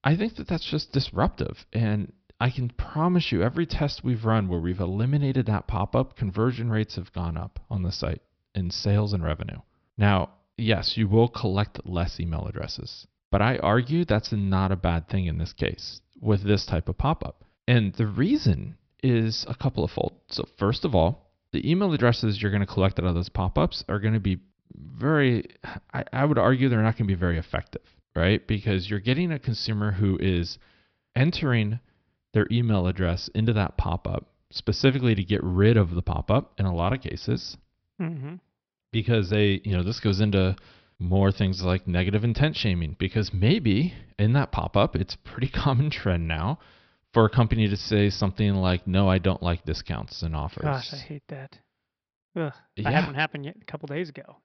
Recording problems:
high frequencies cut off; noticeable; nothing above 5.5 kHz

